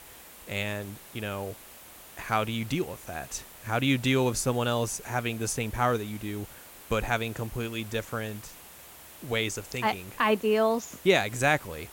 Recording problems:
hiss; noticeable; throughout; 15 dB below the speech

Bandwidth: 16.5 kHz